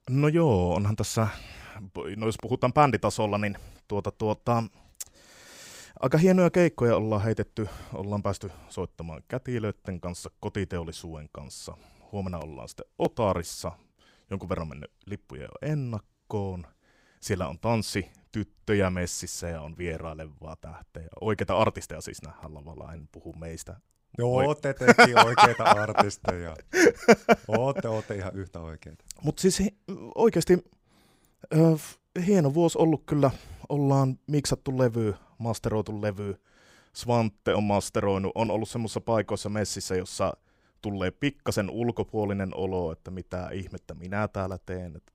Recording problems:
none

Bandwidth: 15.5 kHz